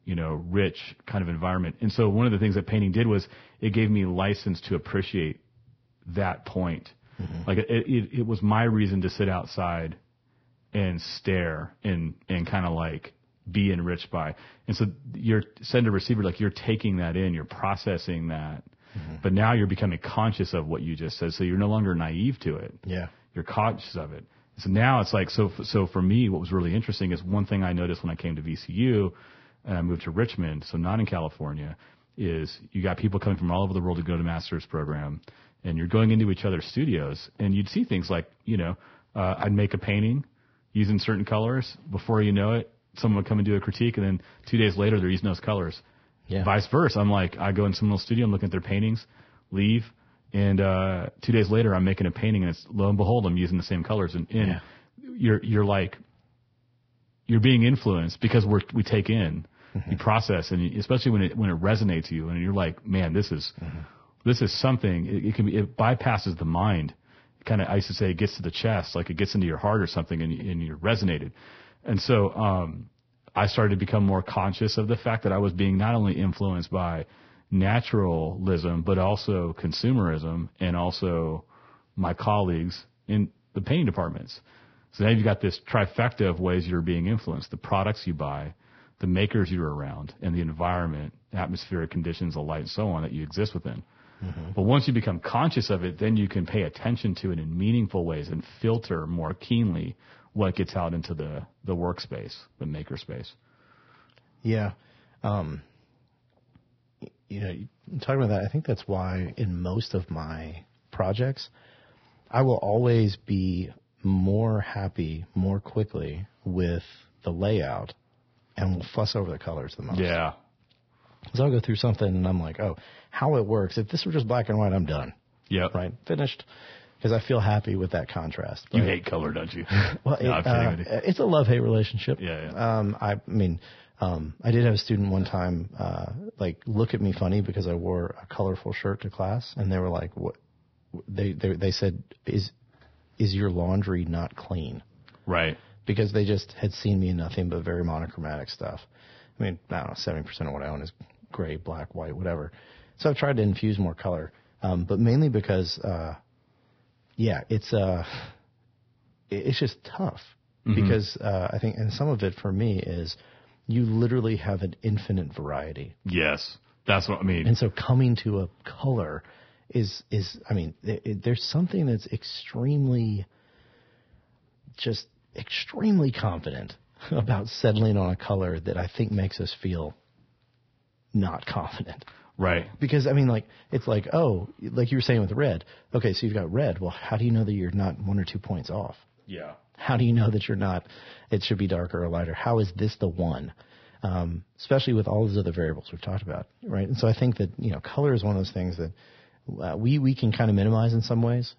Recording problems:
garbled, watery; badly; nothing above 5.5 kHz

